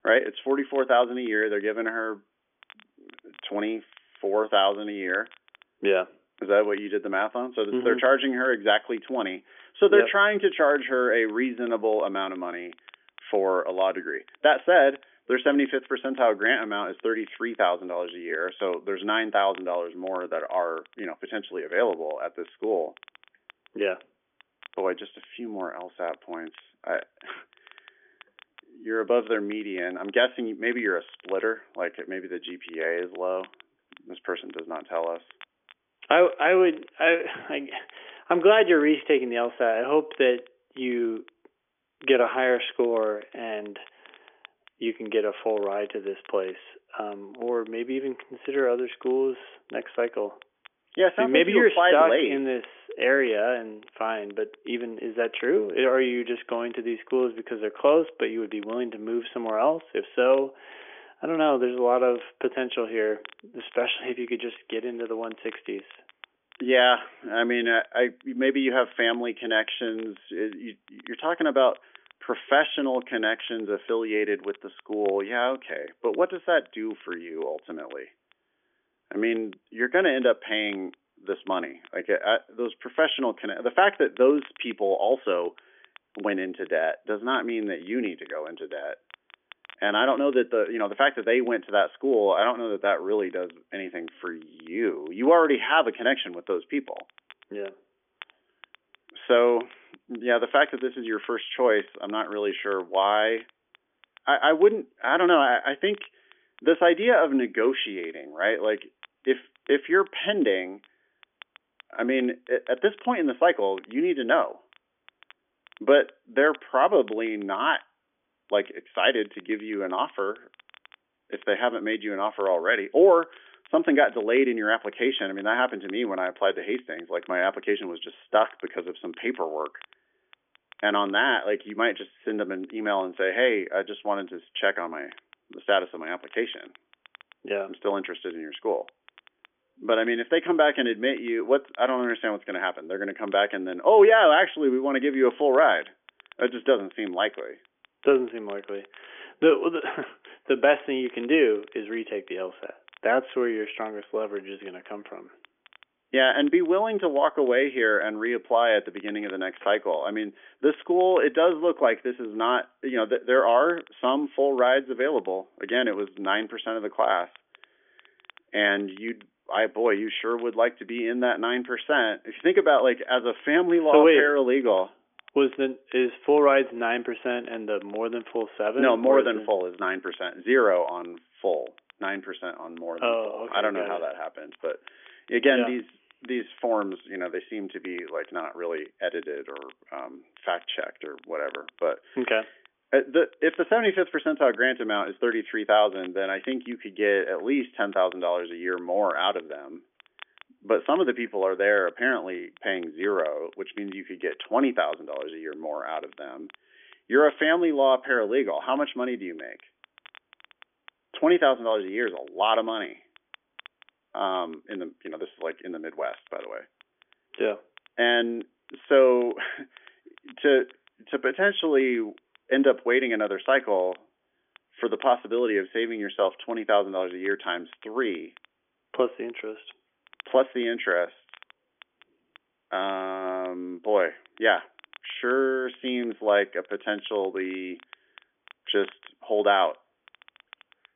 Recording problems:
phone-call audio; nothing above 3.5 kHz
crackle, like an old record; faint; 30 dB below the speech

